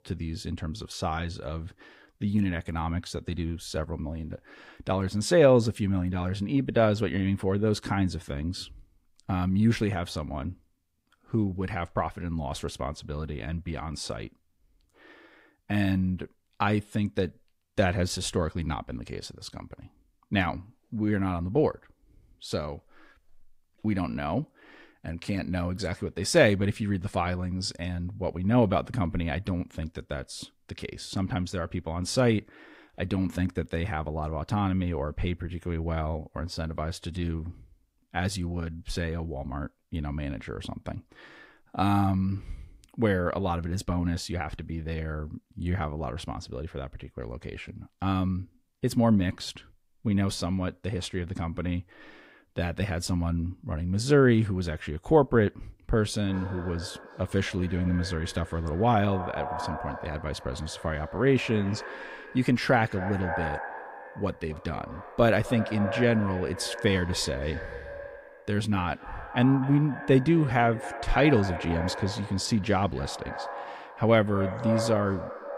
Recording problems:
echo of what is said; strong; from 56 s on; 260 ms later, 10 dB below the speech

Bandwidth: 15.5 kHz